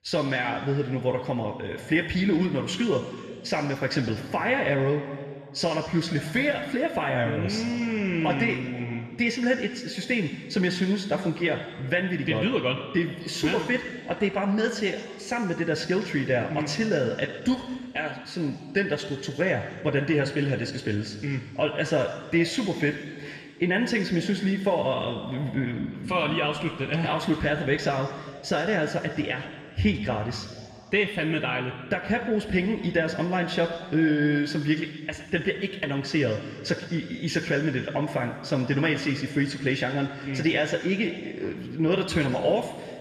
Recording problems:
room echo; noticeable; dies away in 1.9 s
off-mic speech; somewhat distant

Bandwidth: 14 kHz